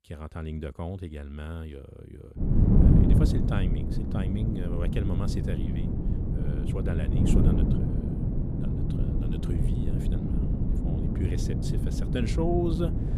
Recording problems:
wind noise on the microphone; heavy; from 2.5 s on; 2 dB above the speech

